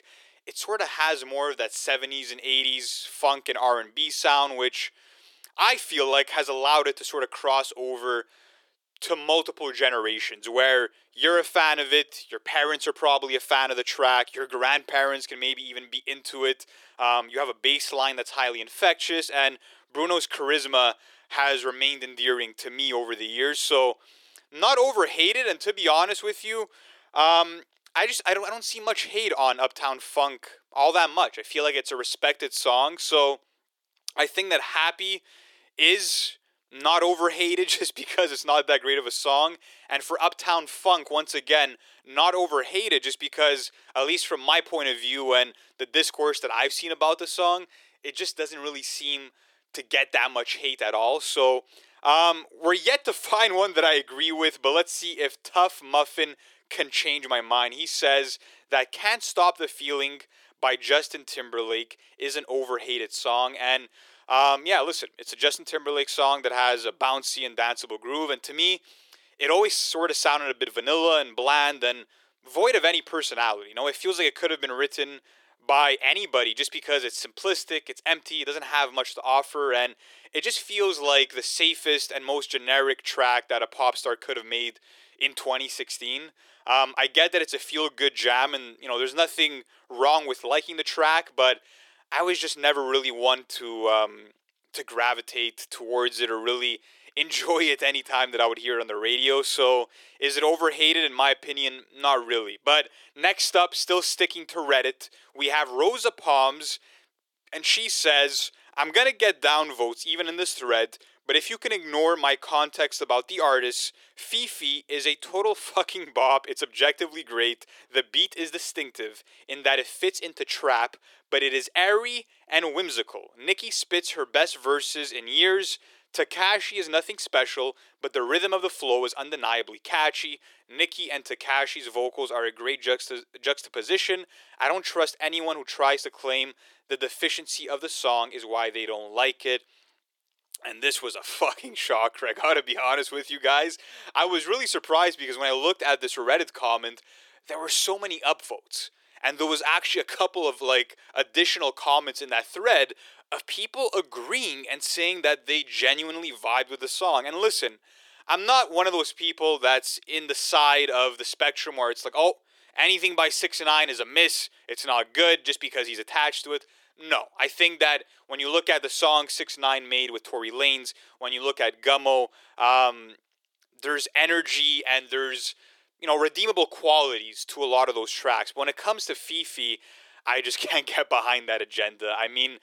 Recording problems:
thin; very; fading below 350 Hz

